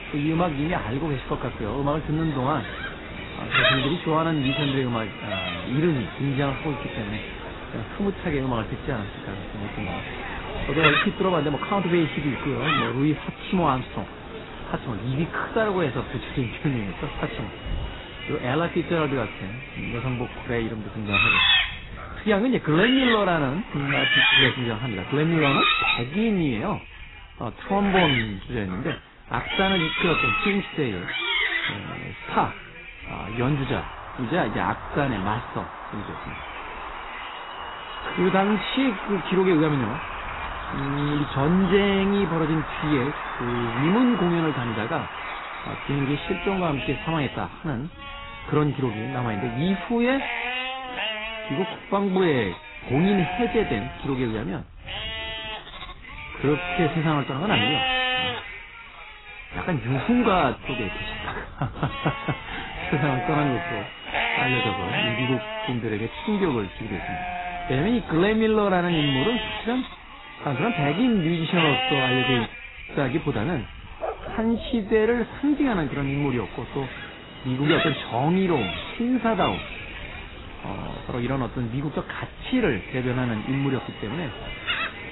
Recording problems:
garbled, watery; badly; nothing above 4 kHz
animal sounds; loud; throughout; 2 dB below the speech
wind noise on the microphone; occasional gusts; 10 dB below the speech

